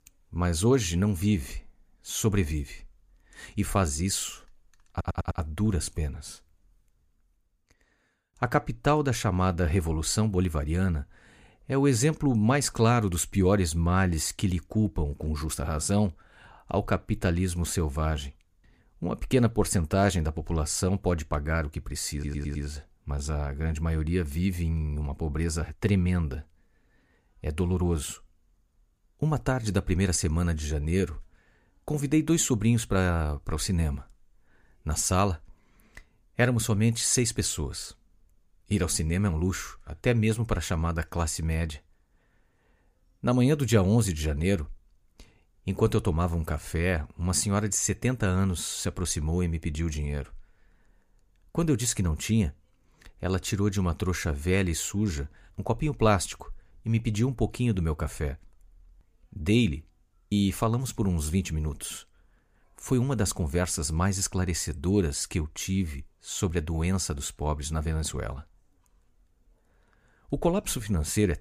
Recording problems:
audio stuttering; at 5 s and at 22 s

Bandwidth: 15 kHz